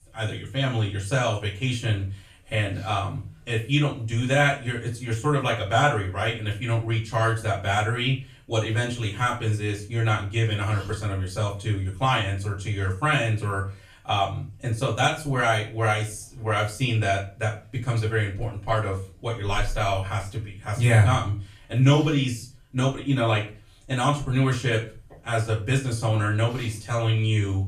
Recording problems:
off-mic speech; far
room echo; slight; dies away in 0.3 s

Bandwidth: 14.5 kHz